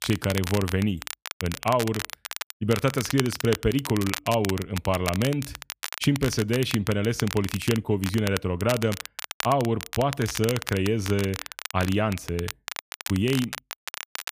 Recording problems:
crackle, like an old record; loud; 9 dB below the speech

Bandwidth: 15 kHz